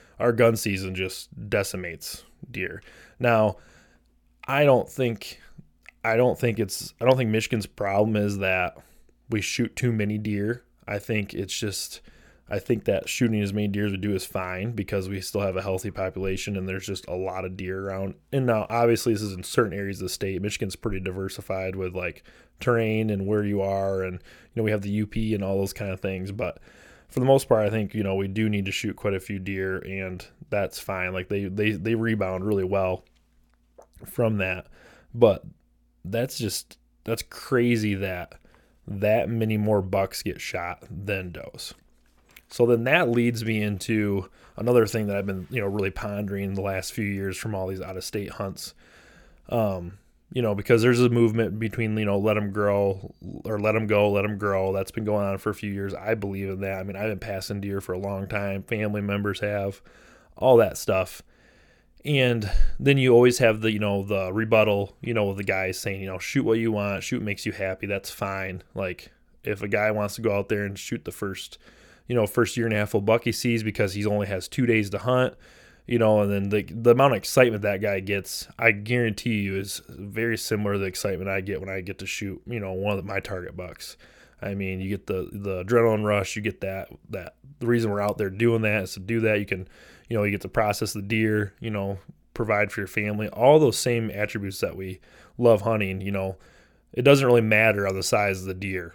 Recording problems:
none

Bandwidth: 18 kHz